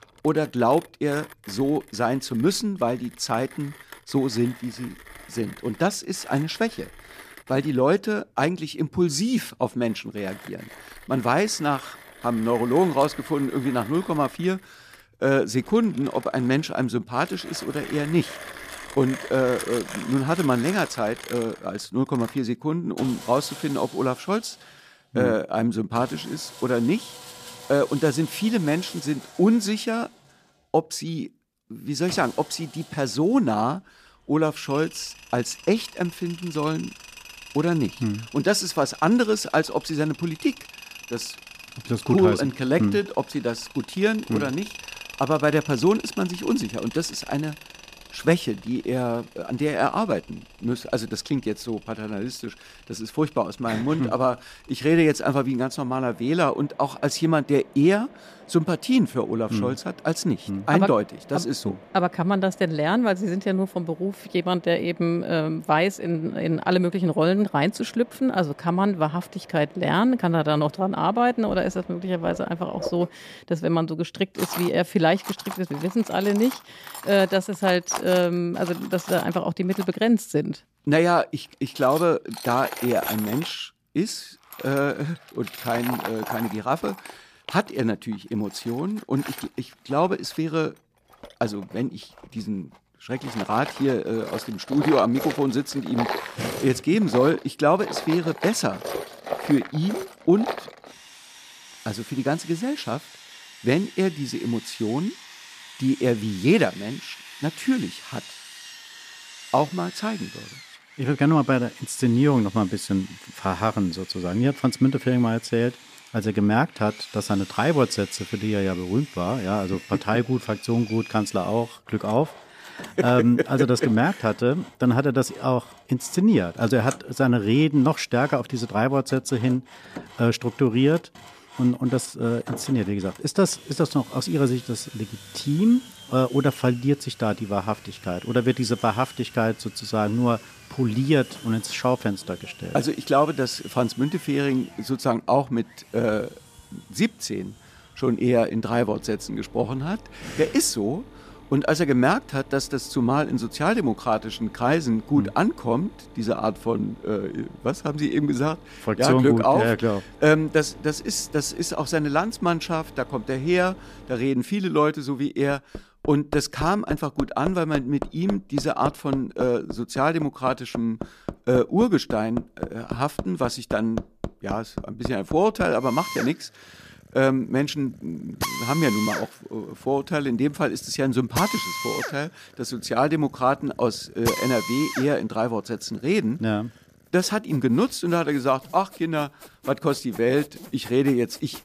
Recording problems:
machinery noise; noticeable; throughout; 15 dB below the speech

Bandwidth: 14.5 kHz